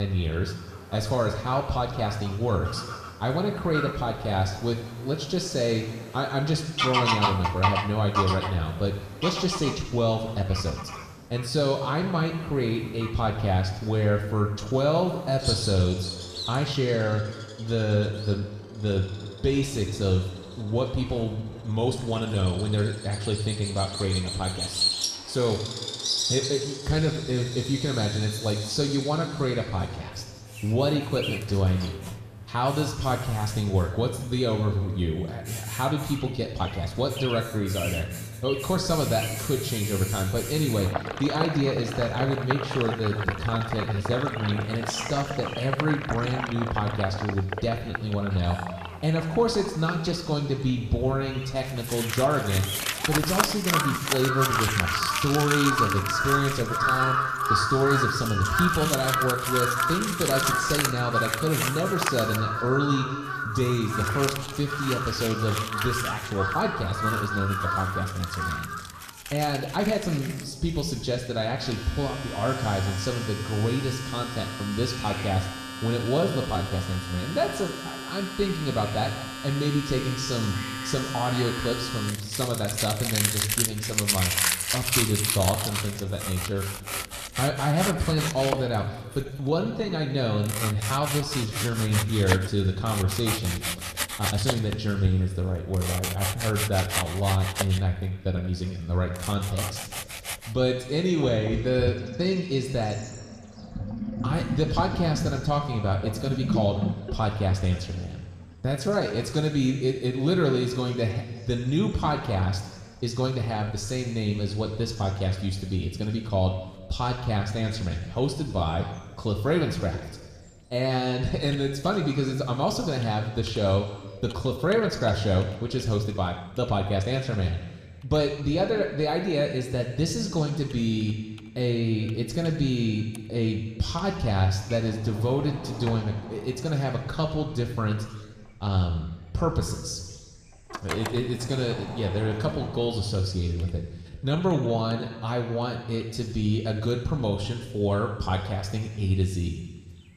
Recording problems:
room echo; noticeable; dies away in 1.5 s
off-mic speech; somewhat distant
animal sounds; loud; throughout; 4 dB below the speech
household noises; loud; from 30 s on; 5 dB below the speech
abrupt cut into speech; at the start
uneven, jittery; strongly; from 10 s to 2:27

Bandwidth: 14.5 kHz